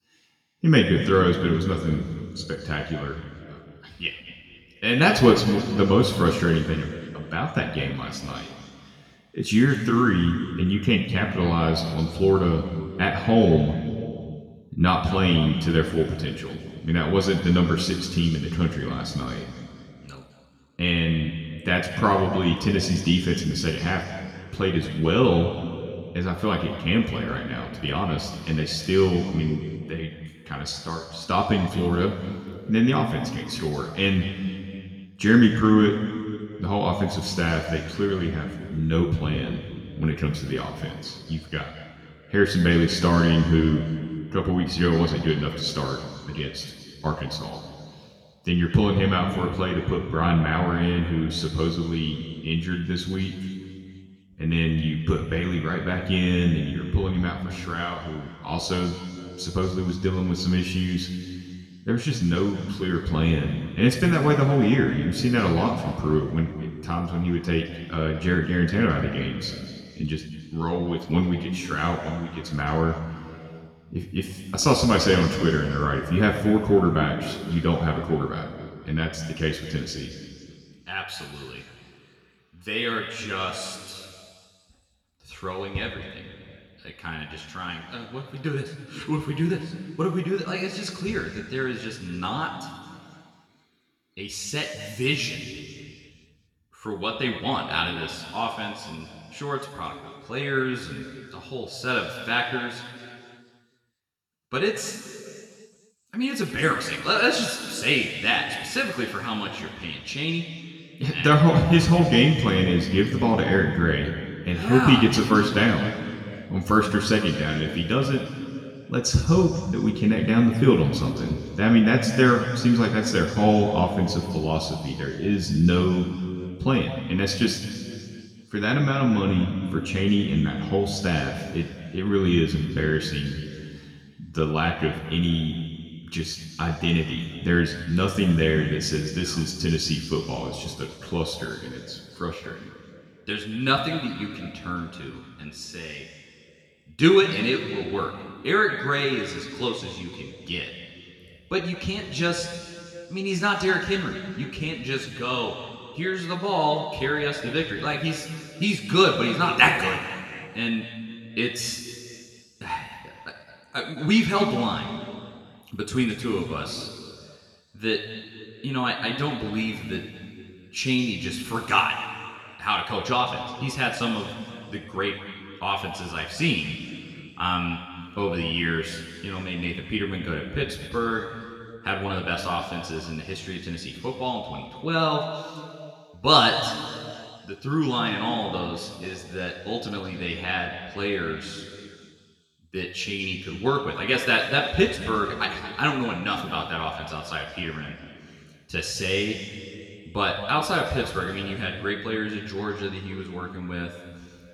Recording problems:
room echo; noticeable; dies away in 2.1 s
off-mic speech; somewhat distant

